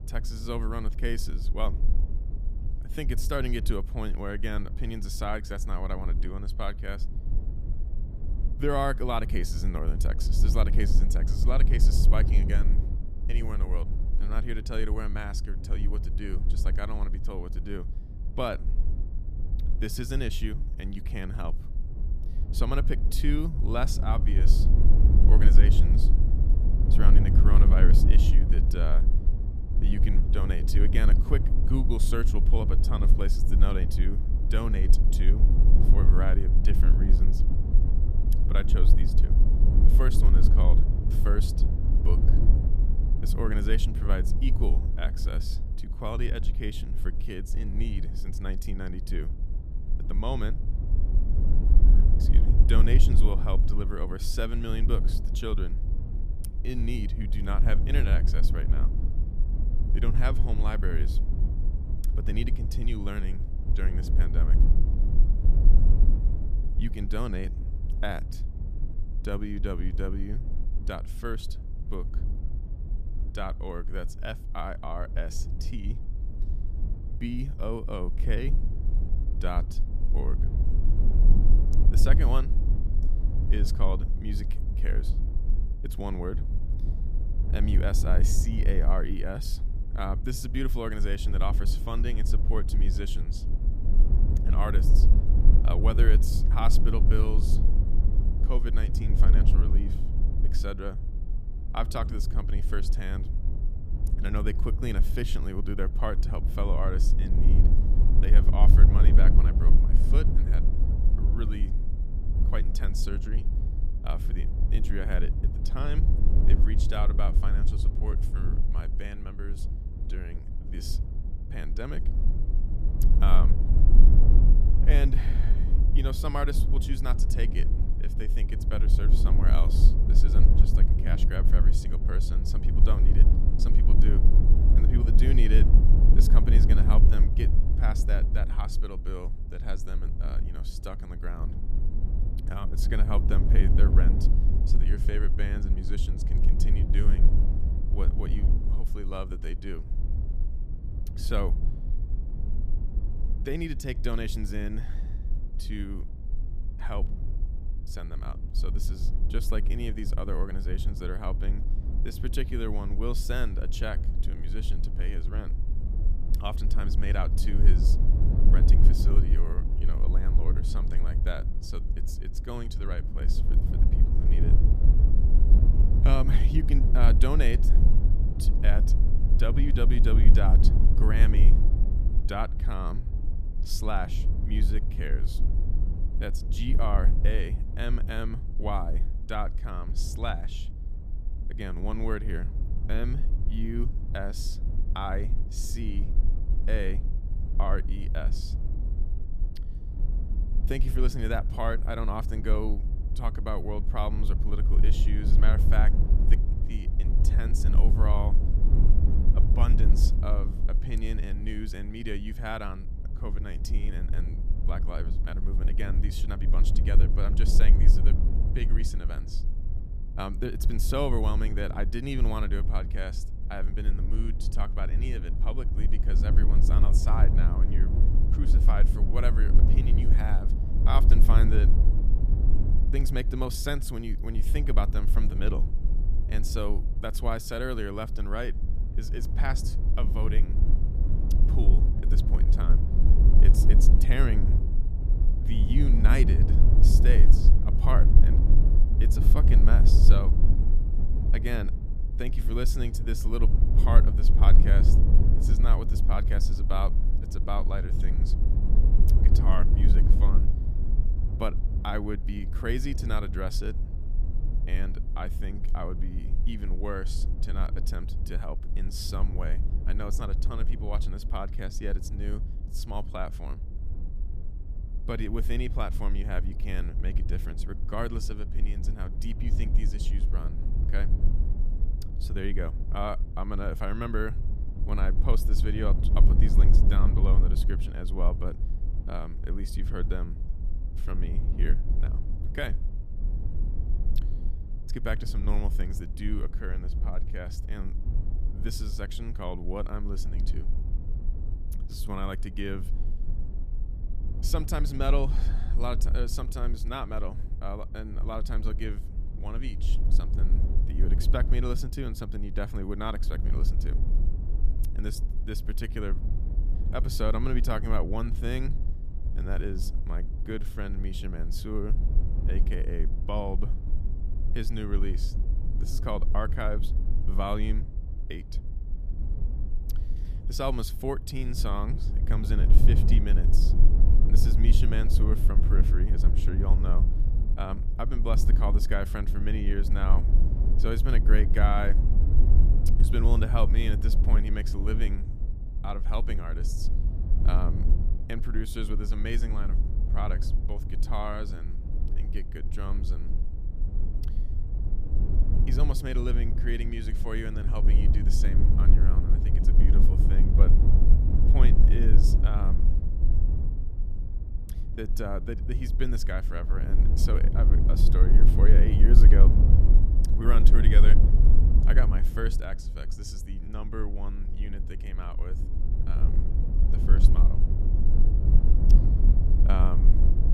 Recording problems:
low rumble; loud; throughout; 7 dB below the speech

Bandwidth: 14.5 kHz